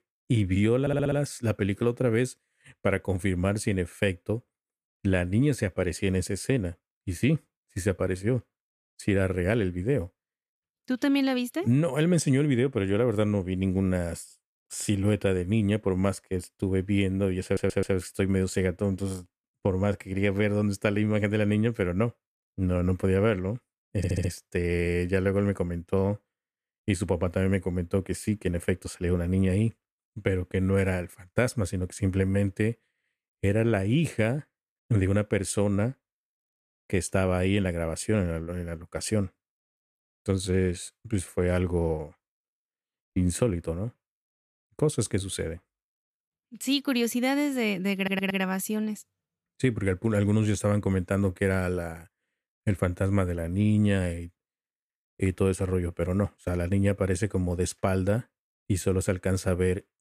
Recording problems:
audio stuttering; 4 times, first at 1 s

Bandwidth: 14.5 kHz